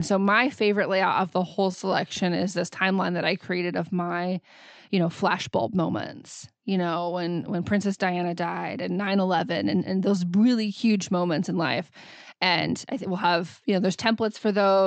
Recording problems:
high frequencies cut off; noticeable; nothing above 8 kHz
abrupt cut into speech; at the start and the end
uneven, jittery; strongly; from 1.5 to 13 s

